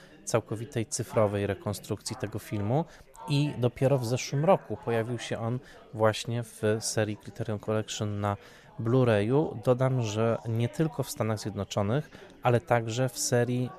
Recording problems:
chatter from many people; faint; throughout; 20 dB below the speech

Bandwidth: 14.5 kHz